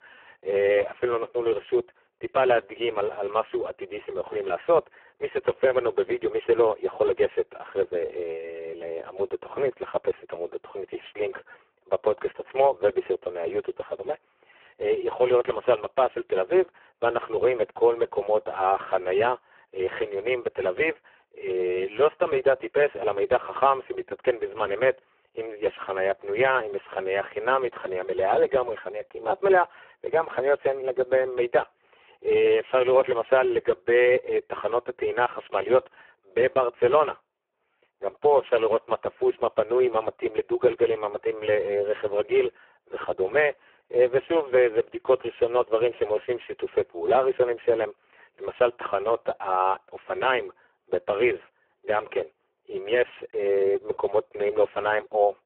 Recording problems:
phone-call audio; poor line

